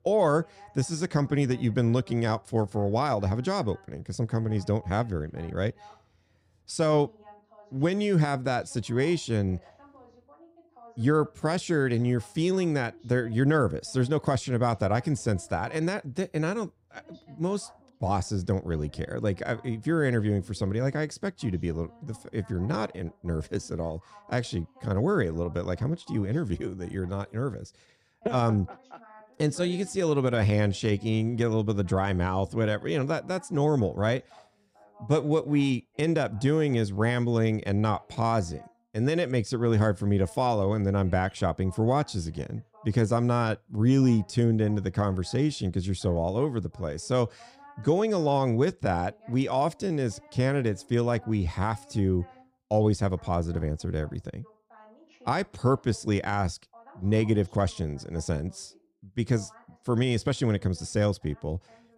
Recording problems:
voice in the background; faint; throughout; 25 dB below the speech

